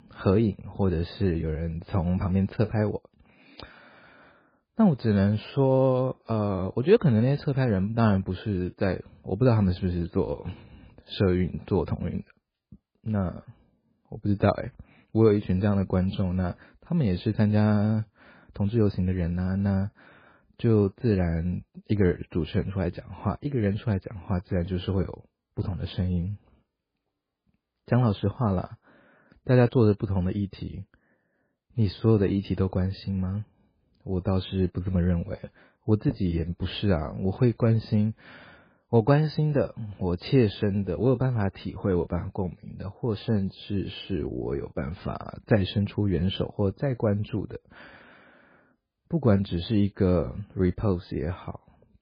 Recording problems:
garbled, watery; badly; nothing above 4 kHz

